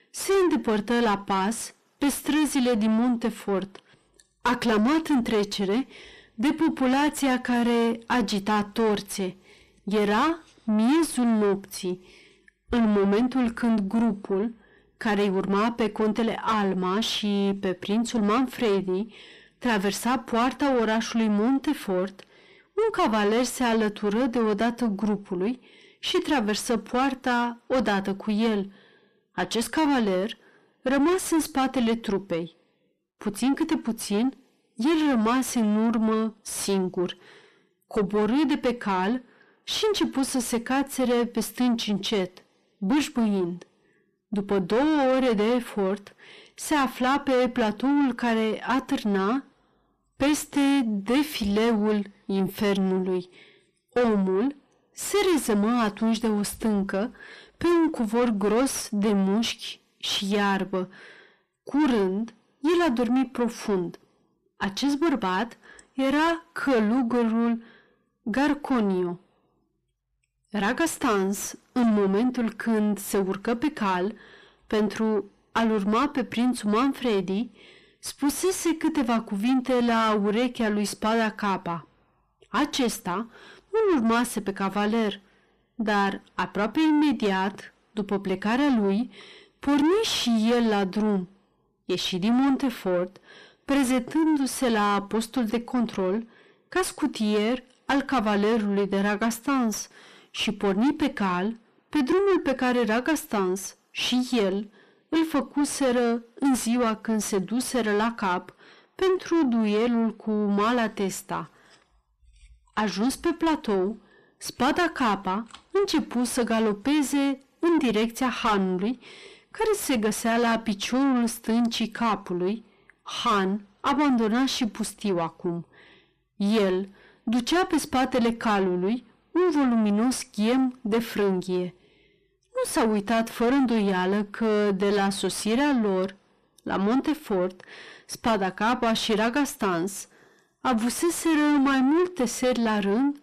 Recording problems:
distortion; heavy; 6 dB below the speech

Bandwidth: 14.5 kHz